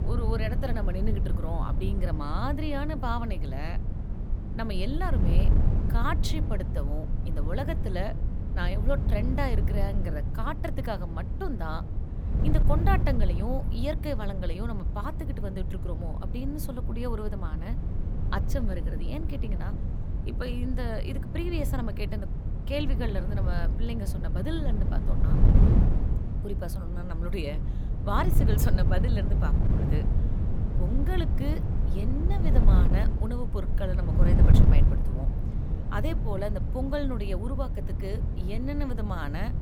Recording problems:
wind noise on the microphone; heavy; 6 dB below the speech

